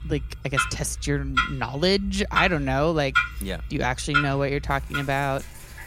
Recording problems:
household noises; loud; throughout; 3 dB below the speech

